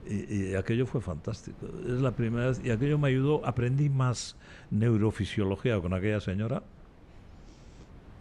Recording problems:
wind noise on the microphone; occasional gusts; 25 dB below the speech

